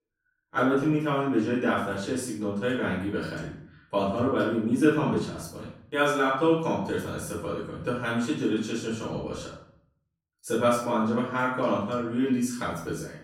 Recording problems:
off-mic speech; far
room echo; noticeable; dies away in 0.5 s

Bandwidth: 16 kHz